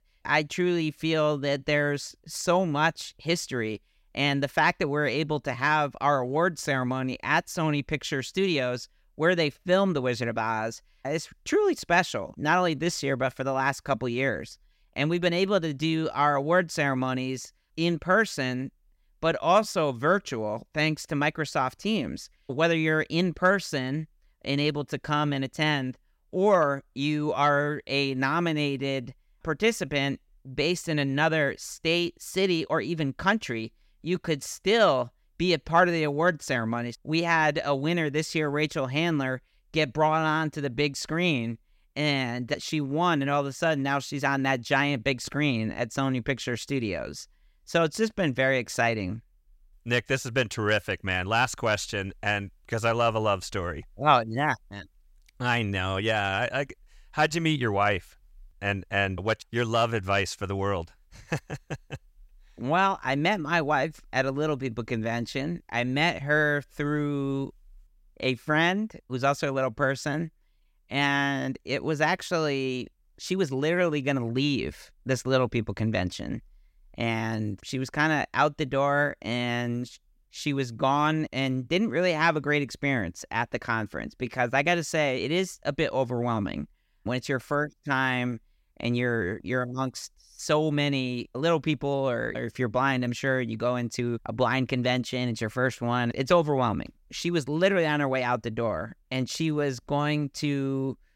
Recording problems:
none

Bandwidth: 16 kHz